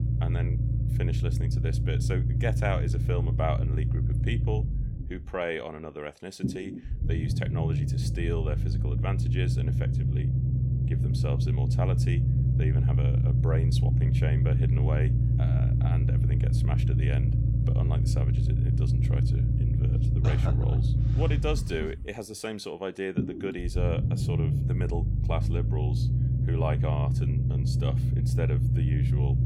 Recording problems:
low rumble; loud; throughout; 2 dB below the speech

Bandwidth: 16 kHz